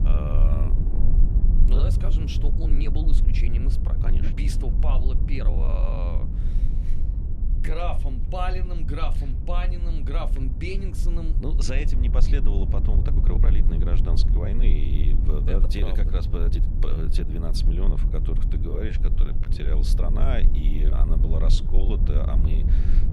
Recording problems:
low rumble; loud; throughout; 6 dB below the speech
uneven, jittery; strongly; from 0.5 to 22 s

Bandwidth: 13.5 kHz